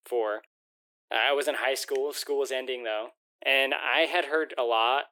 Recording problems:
thin; very; fading below 350 Hz

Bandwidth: 18.5 kHz